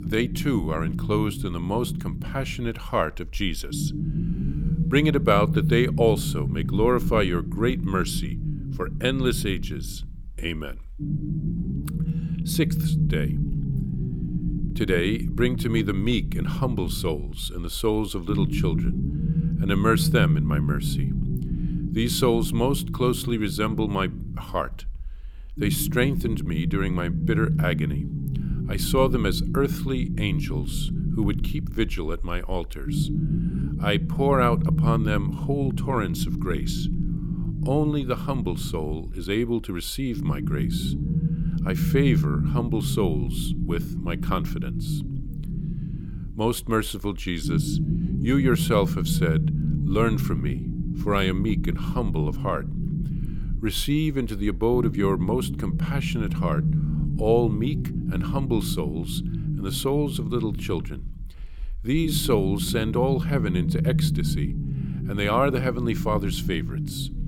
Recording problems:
low rumble; loud; throughout; 9 dB below the speech

